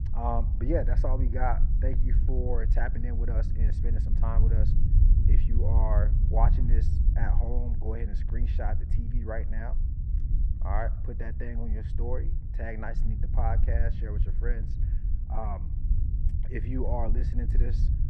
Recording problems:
muffled; very; fading above 3 kHz
low rumble; loud; throughout; 9 dB below the speech

